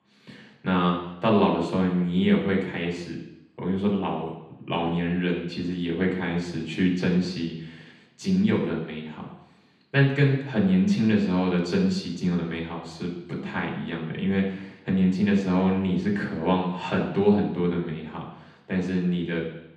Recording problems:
off-mic speech; far
room echo; noticeable; dies away in 0.9 s

